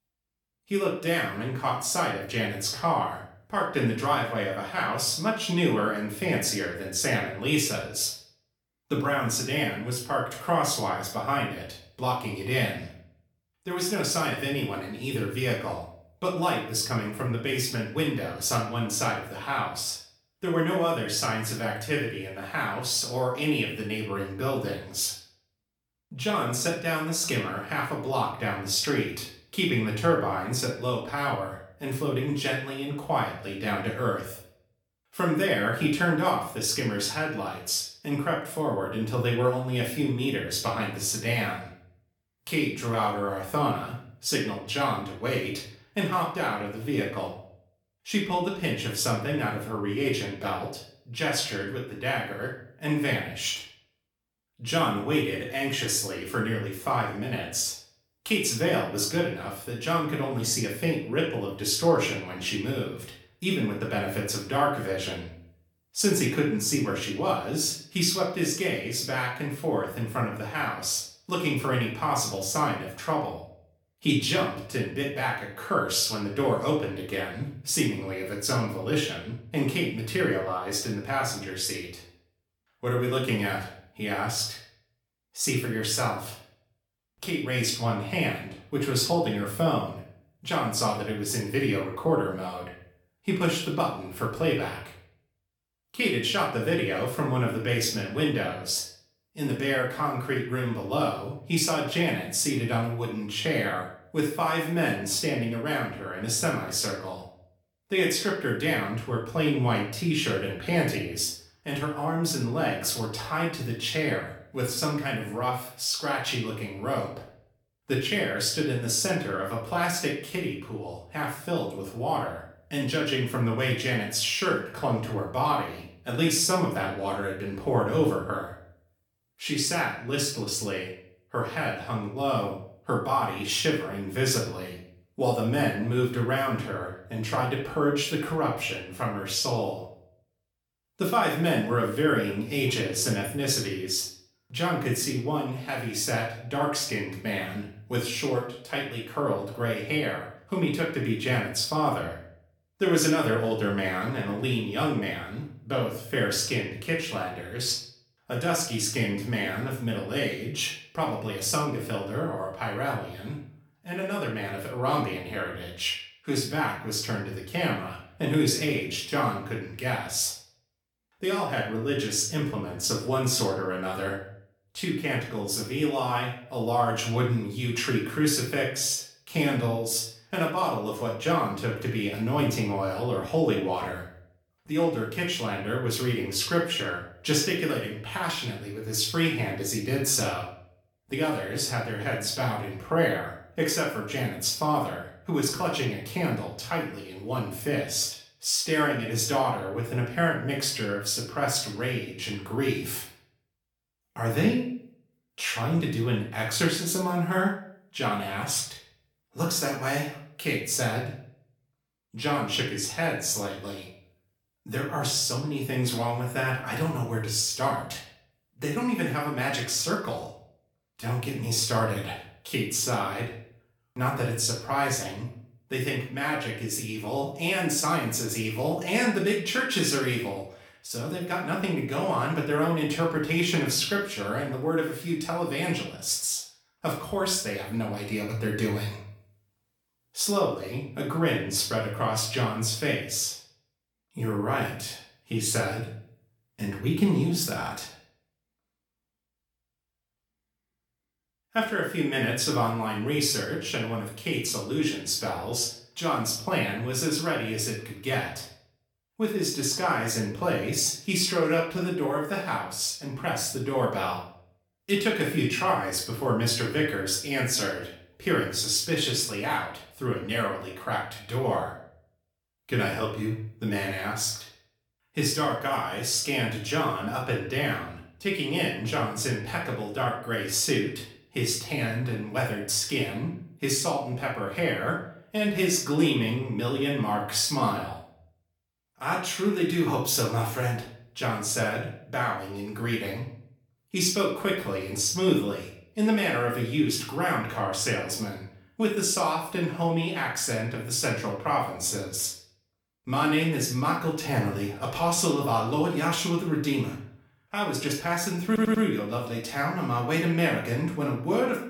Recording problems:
off-mic speech; far
room echo; noticeable; dies away in 0.5 s
audio stuttering; at 5:08

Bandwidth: 18 kHz